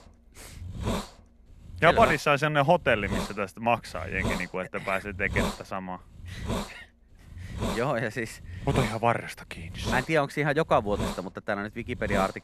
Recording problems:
hiss; loud; throughout; 8 dB below the speech

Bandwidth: 13.5 kHz